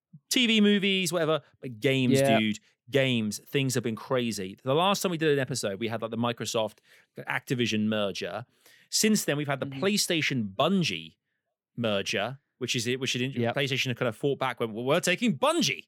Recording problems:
none

